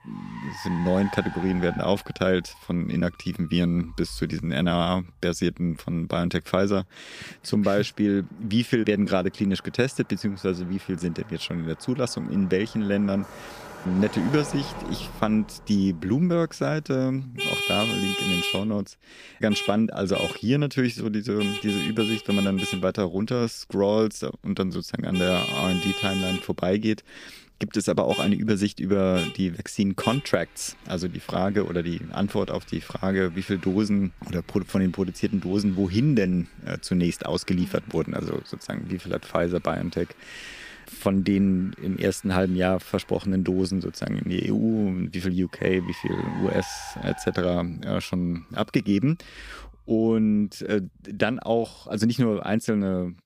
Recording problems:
traffic noise; loud; throughout; 6 dB below the speech

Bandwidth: 15 kHz